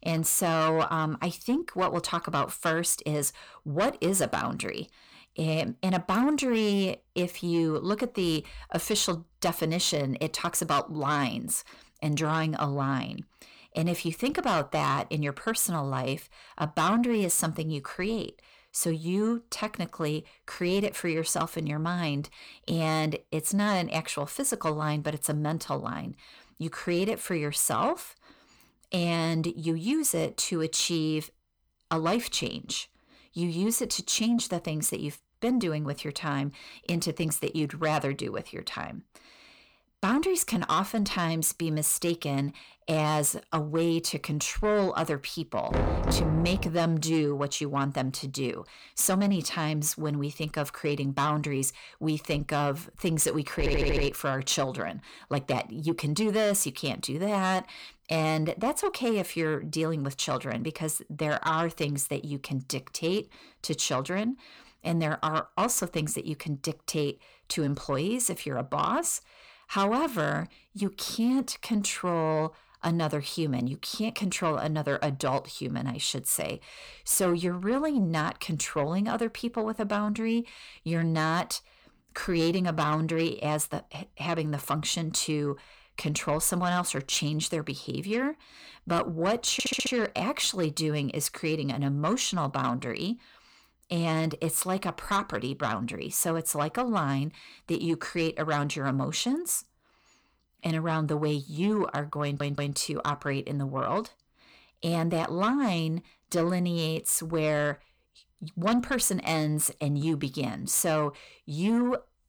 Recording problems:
distortion; slight; 10 dB below the speech
door banging; loud; at 46 s; peak 1 dB above the speech
audio stuttering; at 54 s, at 1:30 and at 1:42

